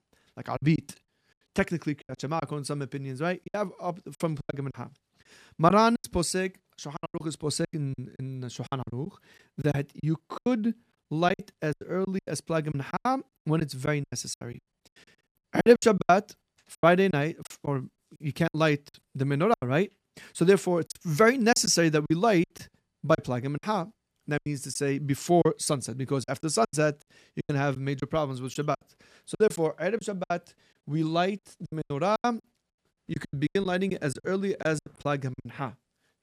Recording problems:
choppy; very; 14% of the speech affected

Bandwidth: 14.5 kHz